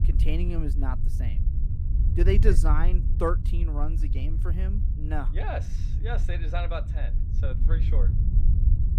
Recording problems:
low rumble; loud; throughout; 9 dB below the speech

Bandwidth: 15.5 kHz